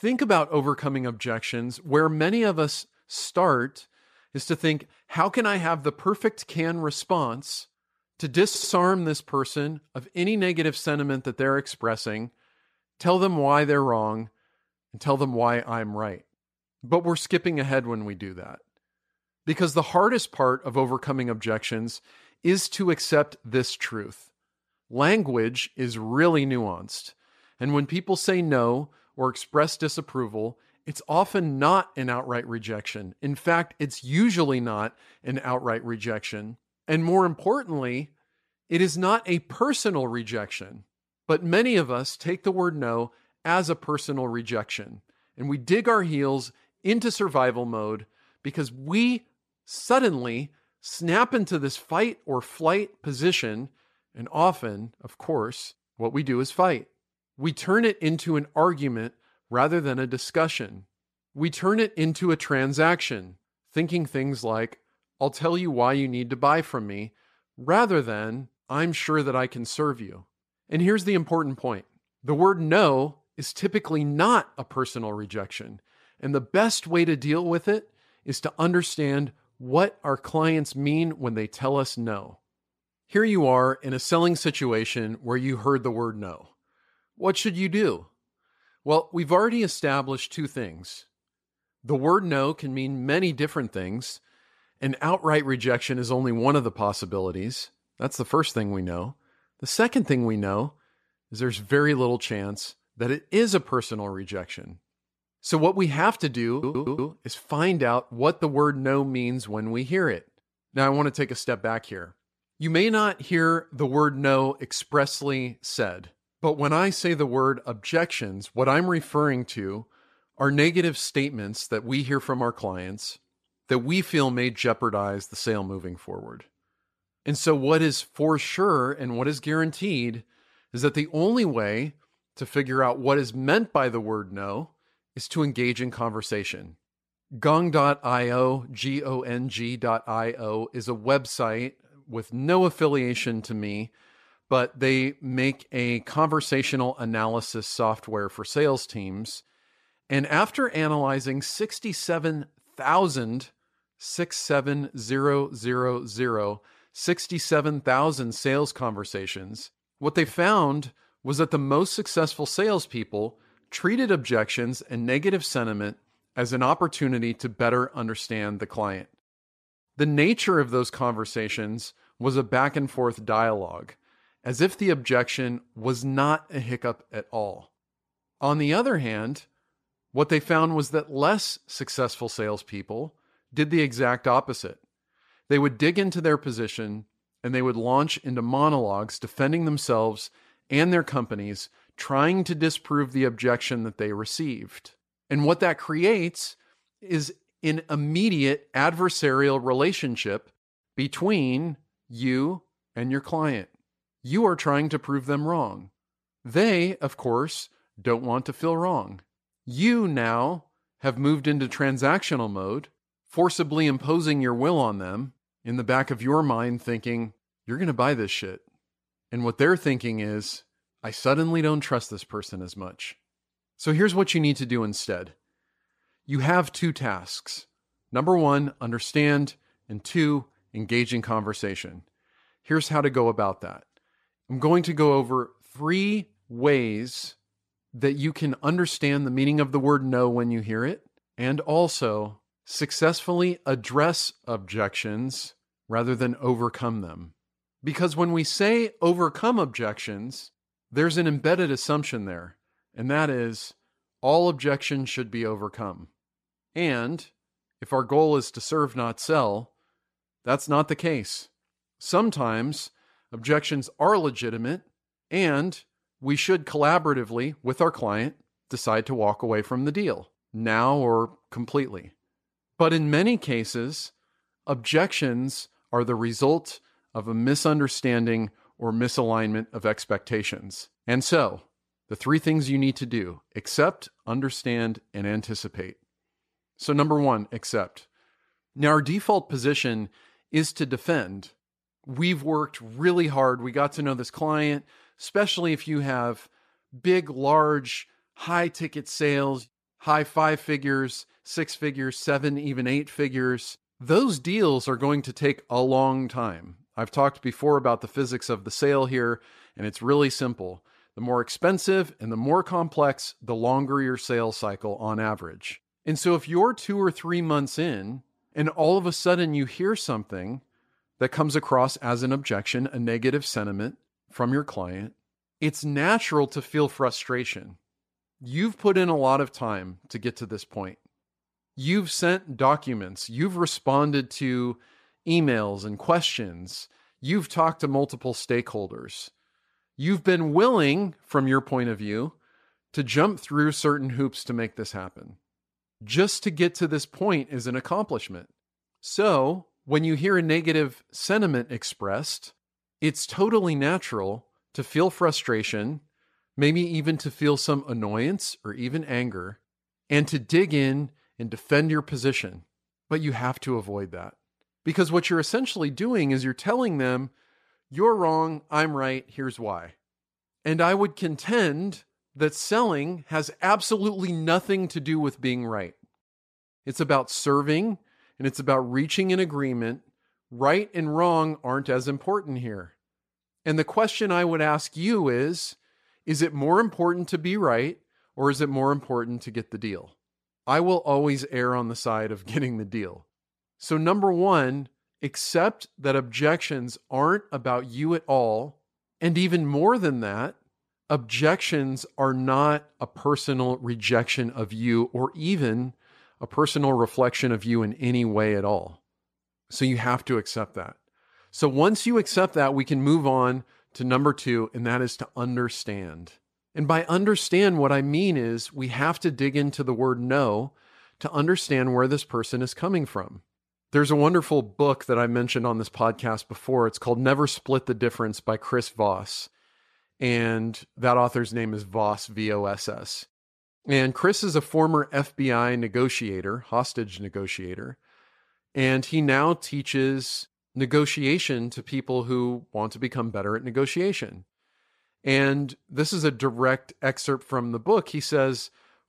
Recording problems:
audio stuttering; at 8.5 s and at 1:47

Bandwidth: 14.5 kHz